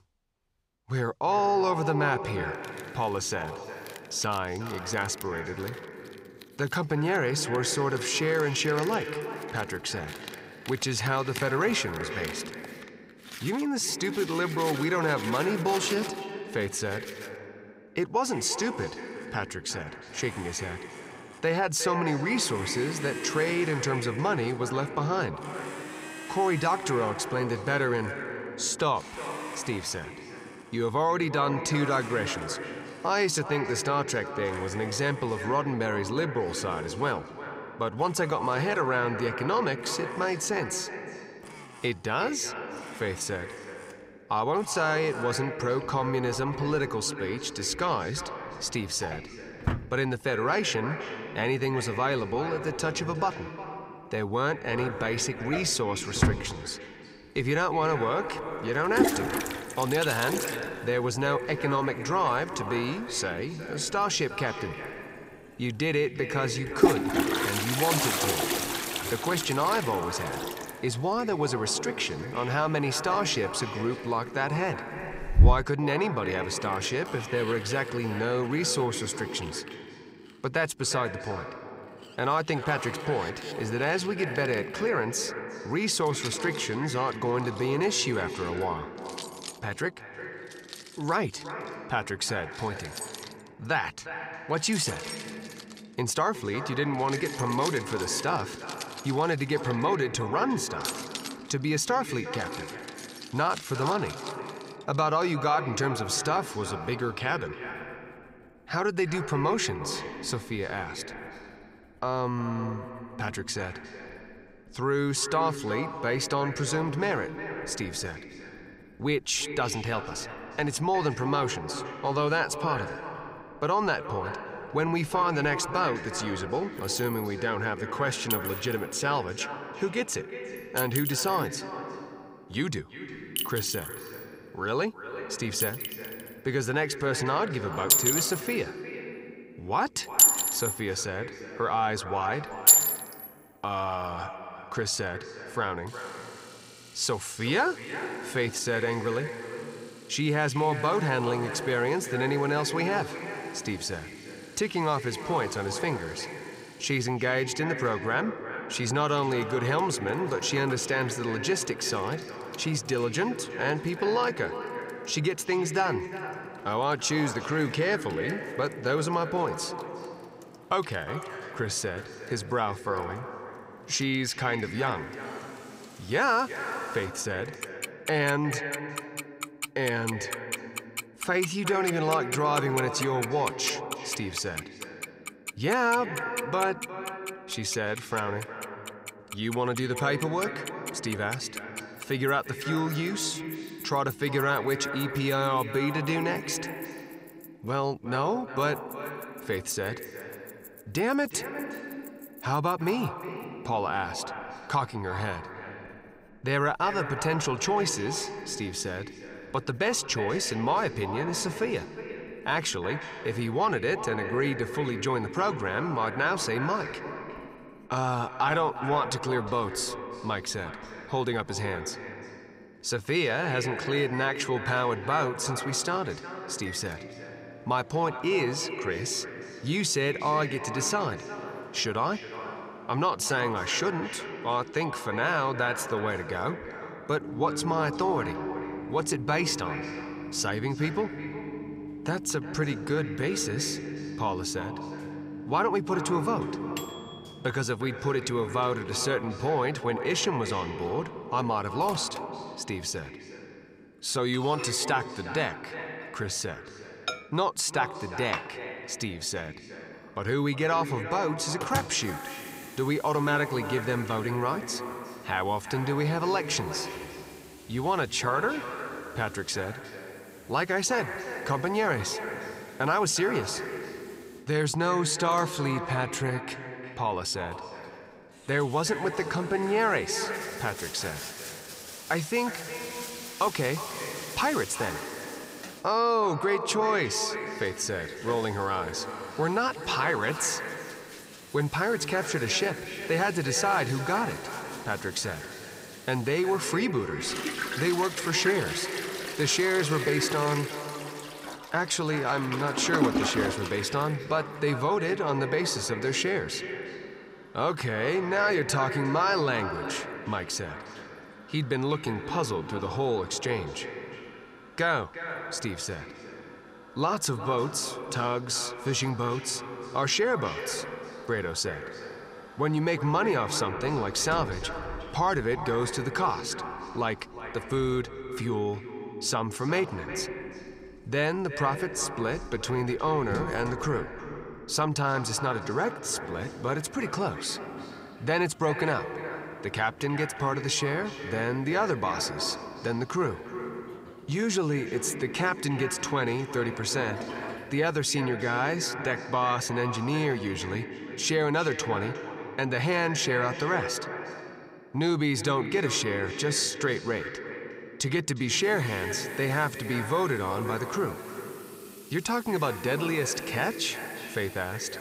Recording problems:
echo of what is said; strong; throughout; 360 ms later, 9 dB below the speech
household noises; loud; throughout; 5 dB below the speech

